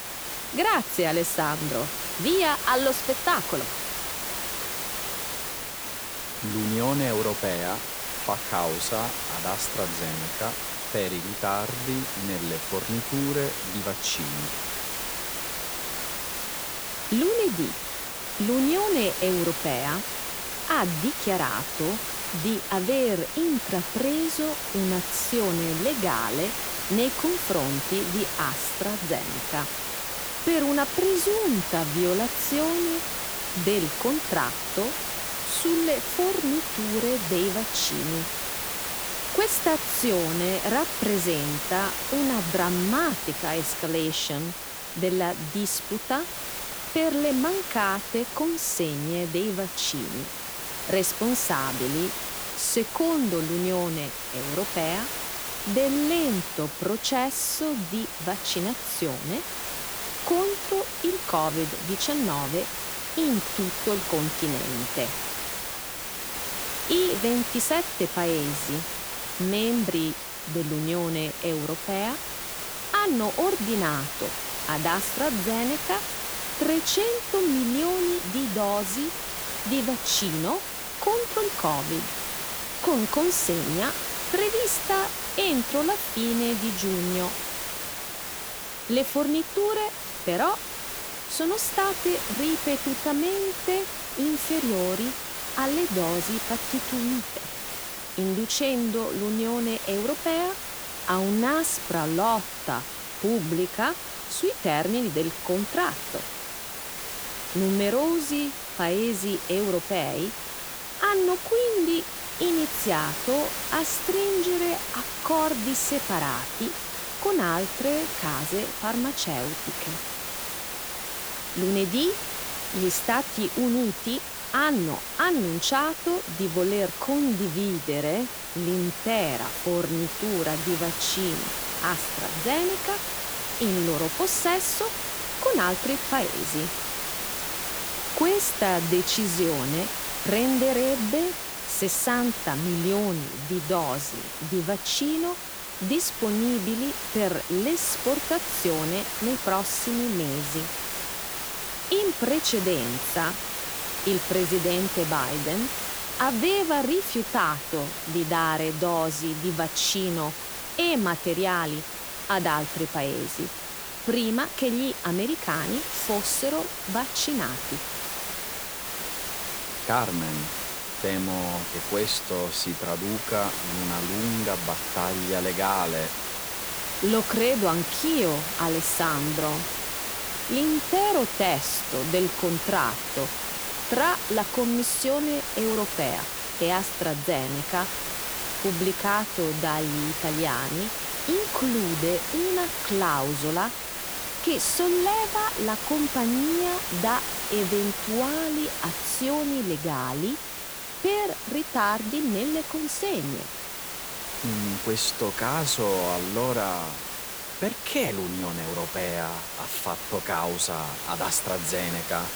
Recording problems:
hiss; loud; throughout; 3 dB below the speech

